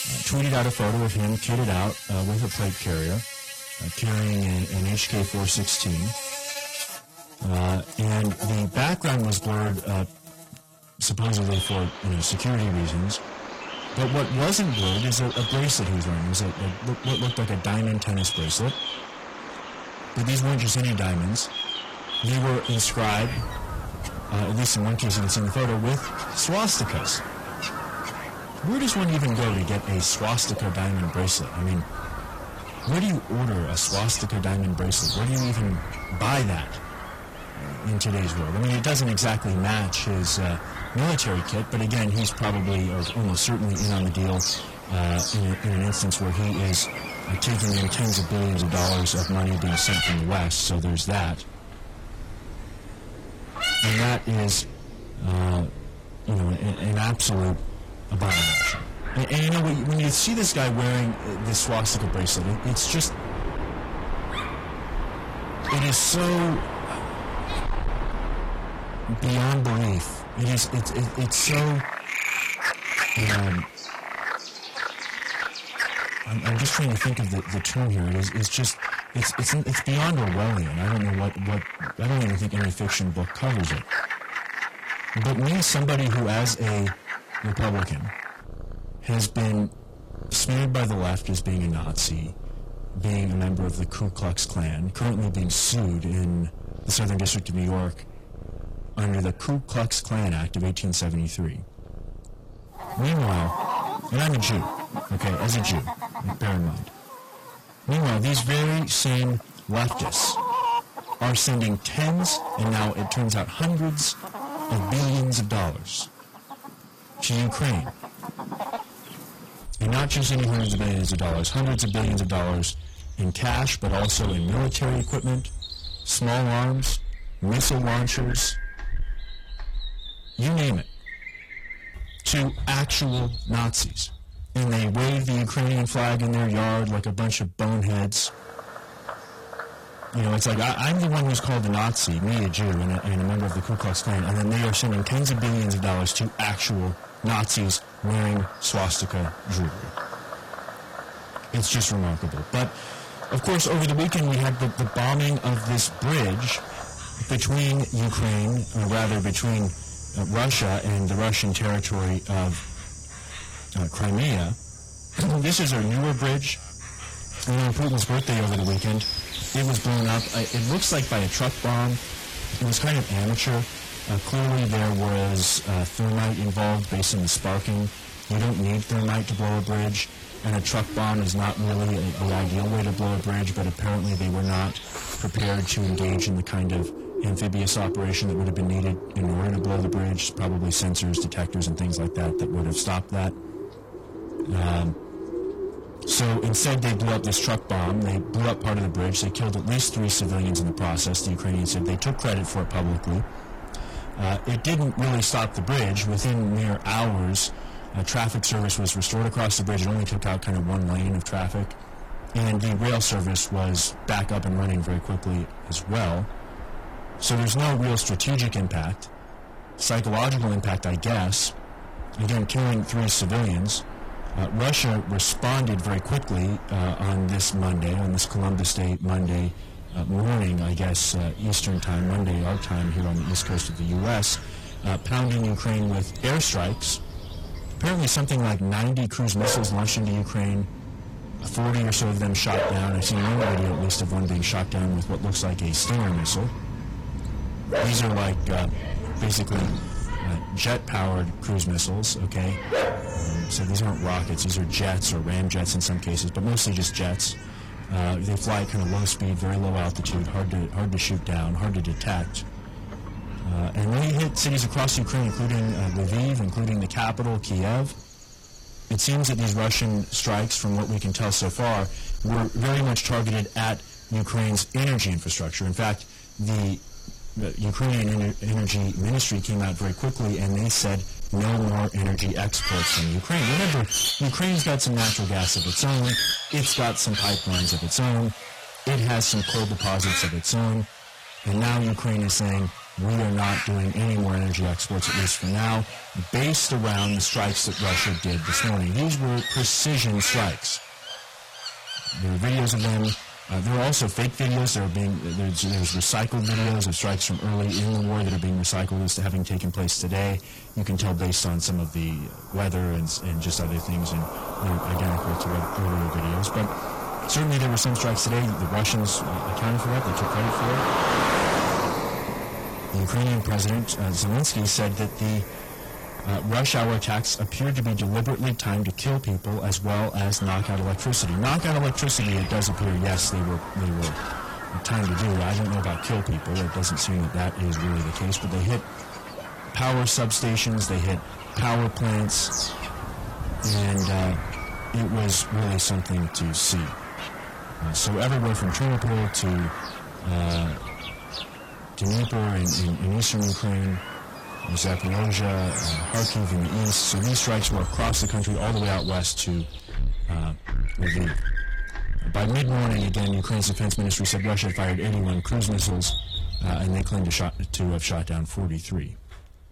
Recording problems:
distortion; heavy; 26% of the sound clipped
garbled, watery; slightly; nothing above 14.5 kHz
animal sounds; loud; throughout; 8 dB below the speech

